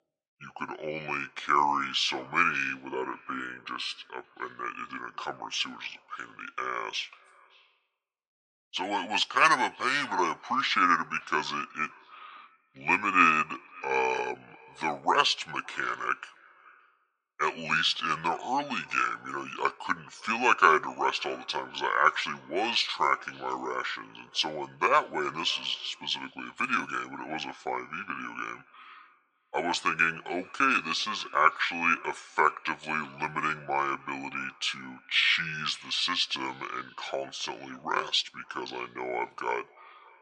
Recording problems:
thin; very; fading below 600 Hz
wrong speed and pitch; too slow and too low; 0.7 times normal speed
echo of what is said; faint; throughout; 570 ms later, 25 dB below the speech

